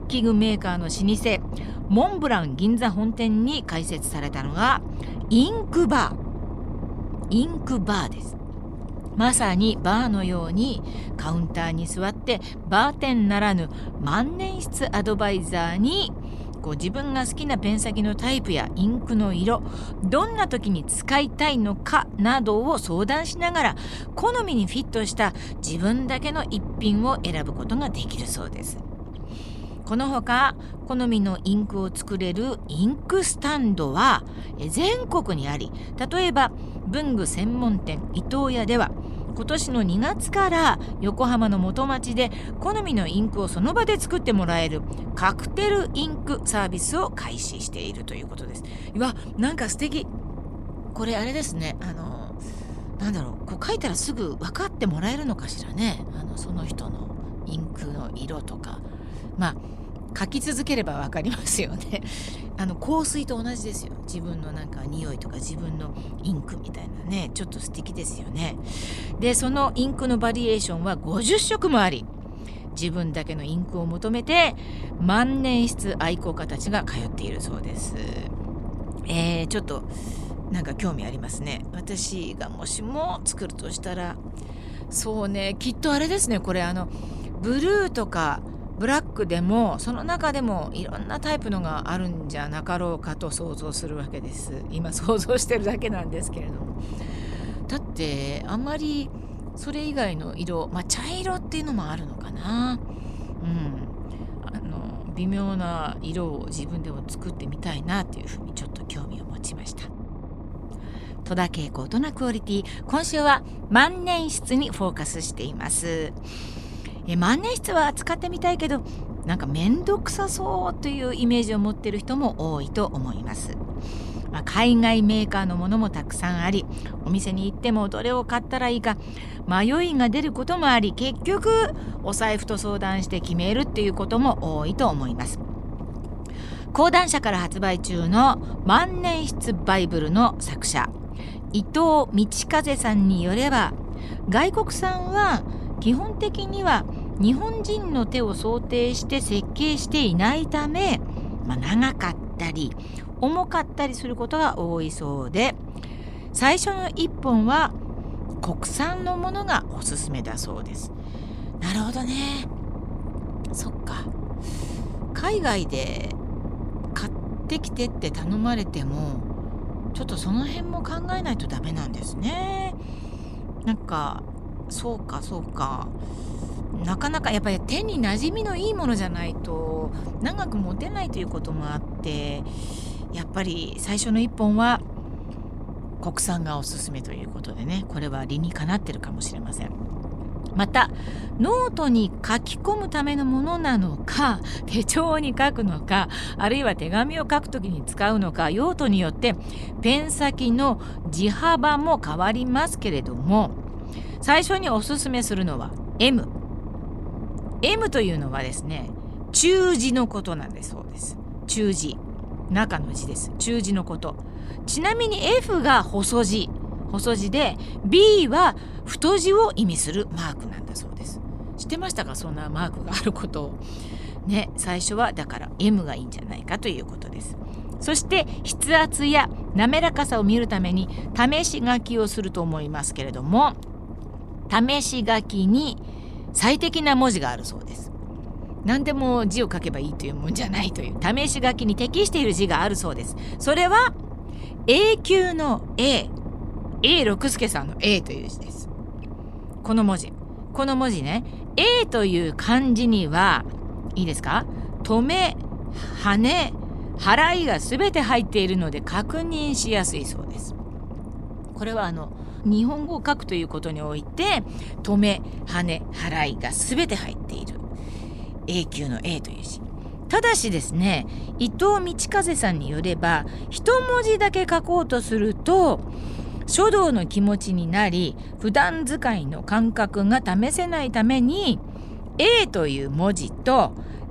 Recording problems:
low rumble; noticeable; throughout; 15 dB below the speech

